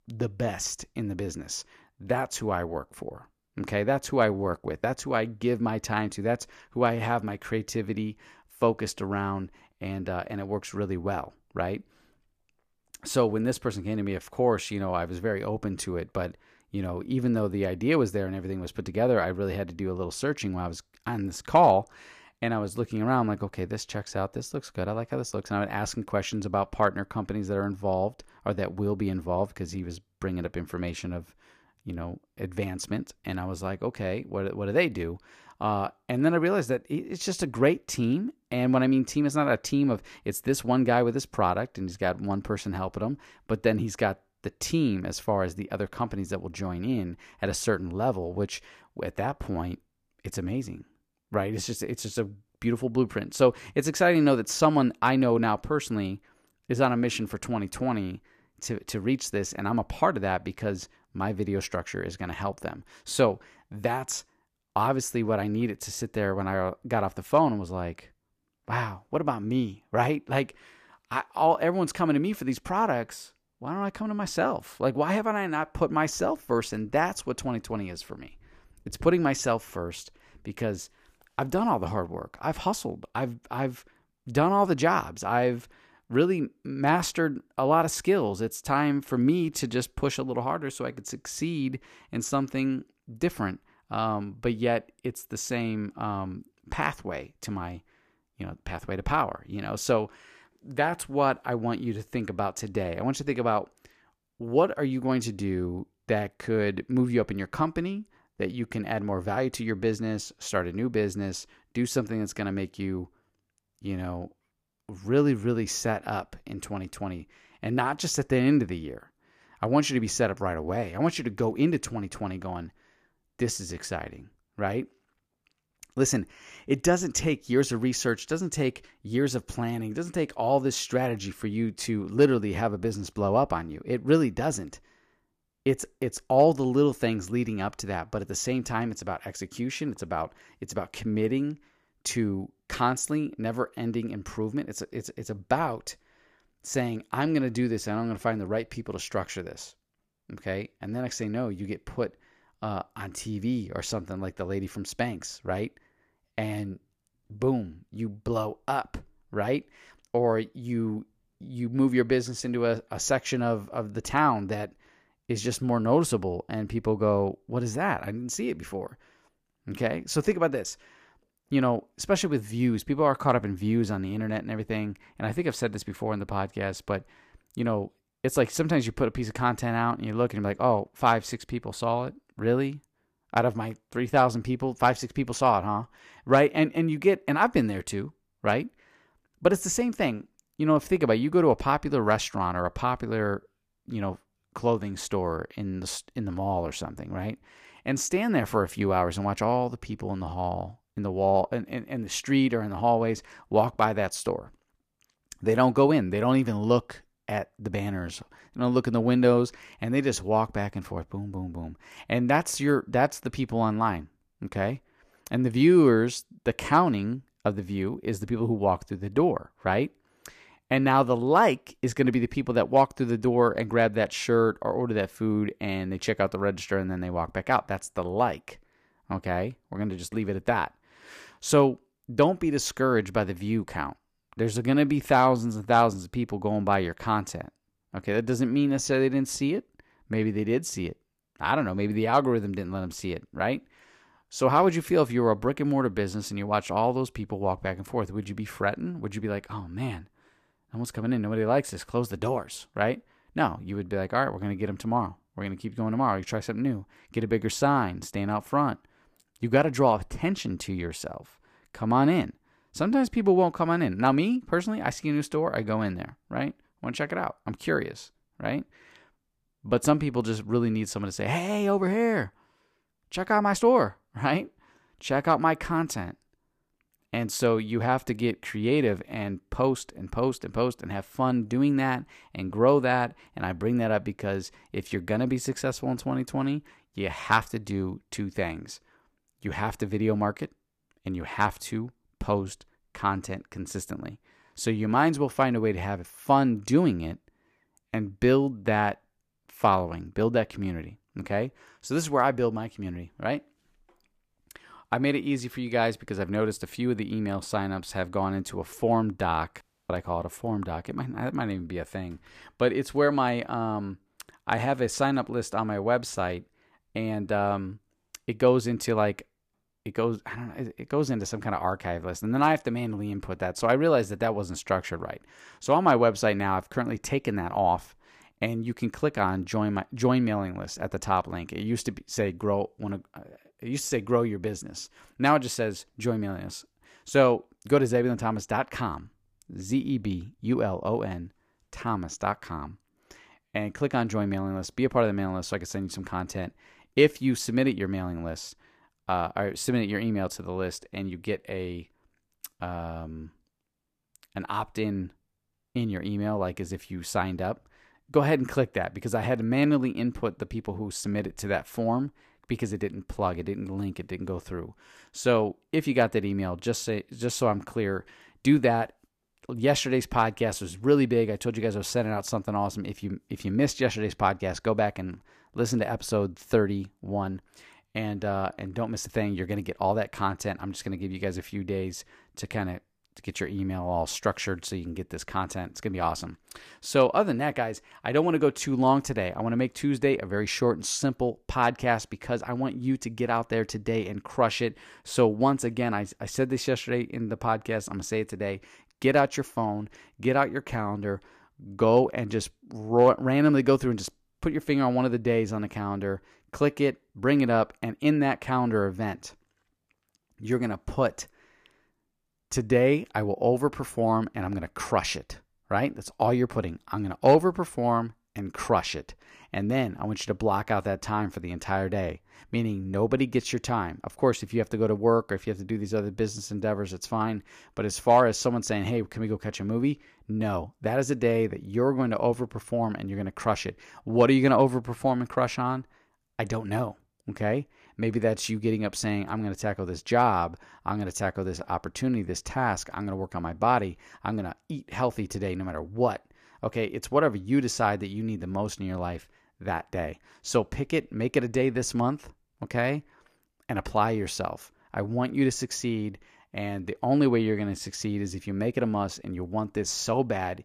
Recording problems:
audio cutting out; at 5:10

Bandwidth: 14.5 kHz